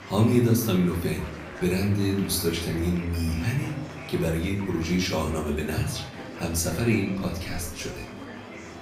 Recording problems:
off-mic speech; far
room echo; slight; dies away in 0.6 s
murmuring crowd; noticeable; throughout; 15 dB below the speech
background music; faint; throughout; 20 dB below the speech

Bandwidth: 15 kHz